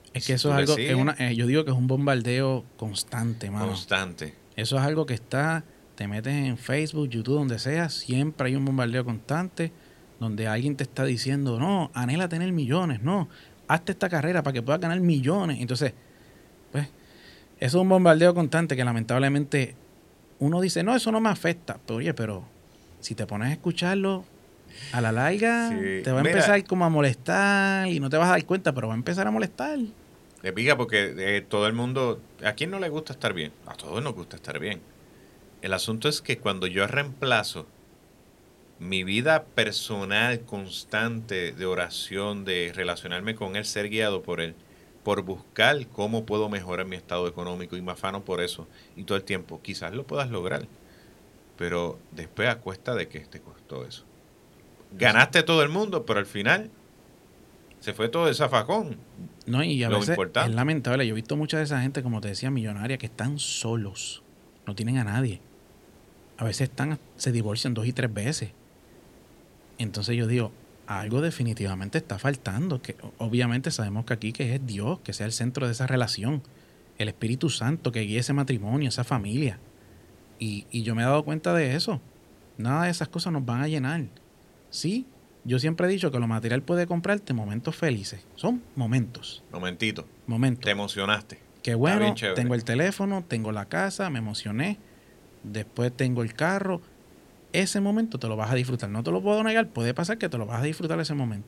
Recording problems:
hiss; faint; throughout; 30 dB below the speech

